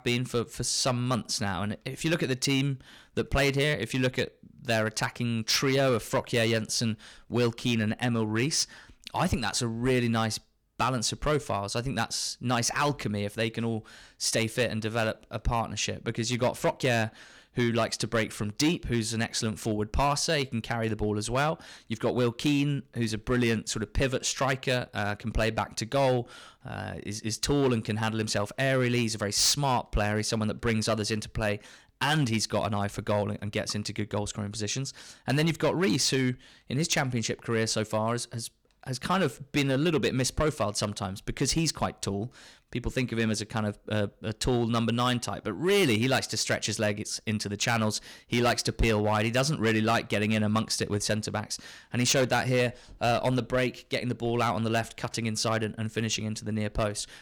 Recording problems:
distortion; slight; 4% of the sound clipped

